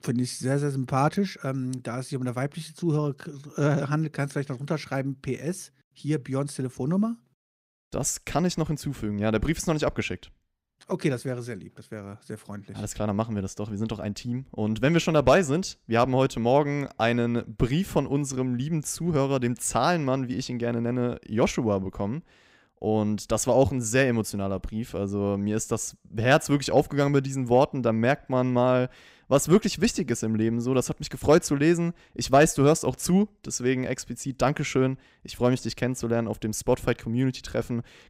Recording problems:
none

